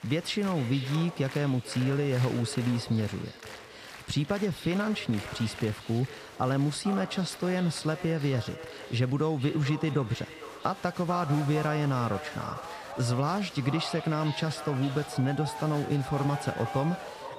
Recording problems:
echo of what is said; noticeable; throughout; 450 ms later, 15 dB below the speech
crowd noise; noticeable; throughout; 15 dB below the speech

